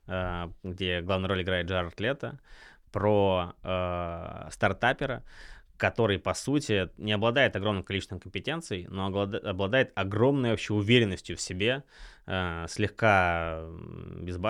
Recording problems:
abrupt cut into speech; at the end

